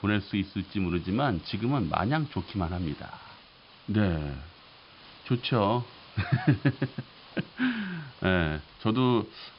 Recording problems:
high frequencies cut off; noticeable; nothing above 5.5 kHz
hiss; faint; throughout; 20 dB below the speech

